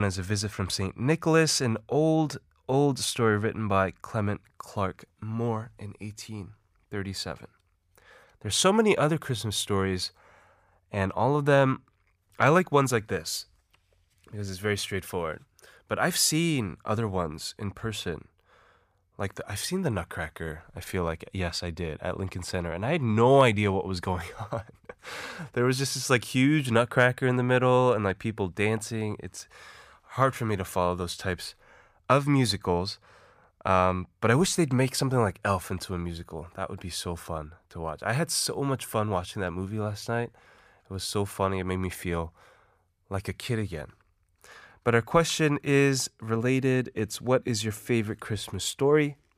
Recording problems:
abrupt cut into speech; at the start

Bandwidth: 15 kHz